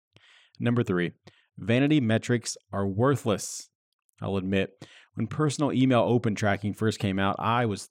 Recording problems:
none

